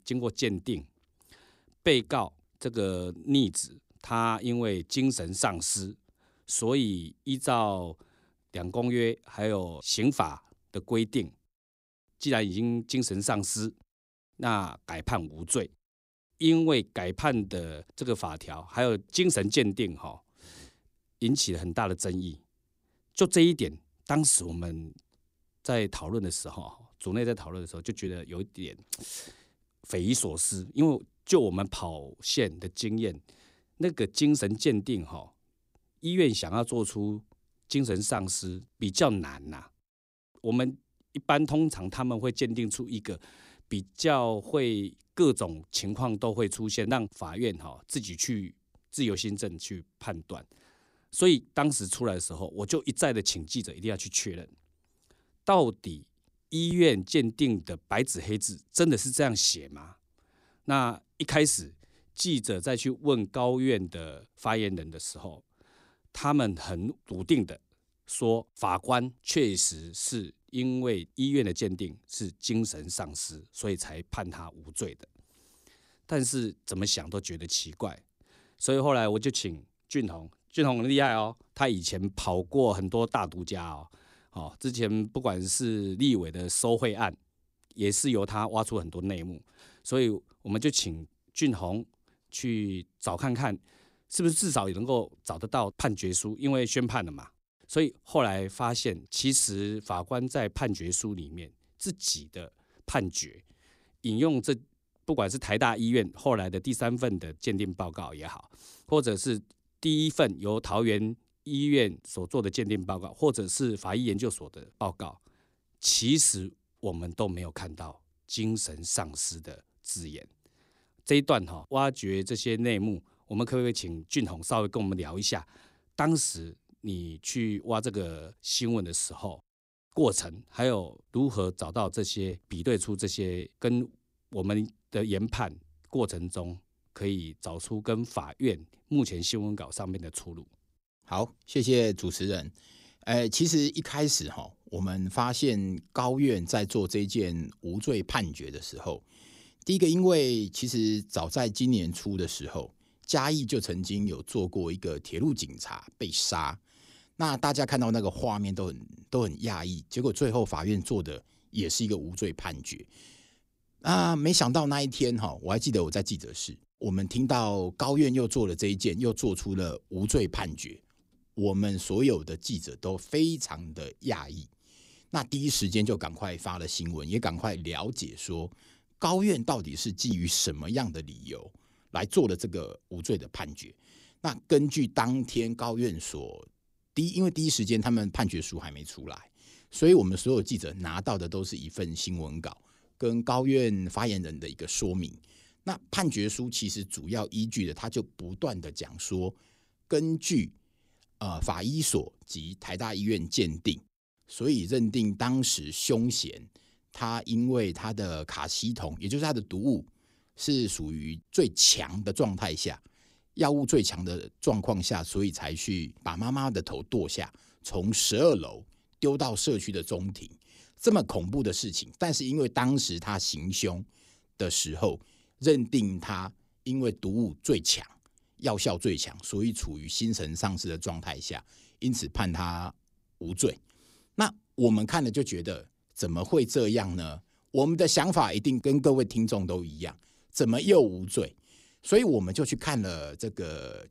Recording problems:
none

